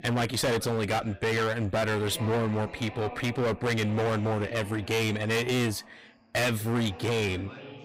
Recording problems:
distortion; heavy; 24% of the sound clipped
background chatter; noticeable; throughout; 2 voices, 15 dB below the speech

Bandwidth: 15.5 kHz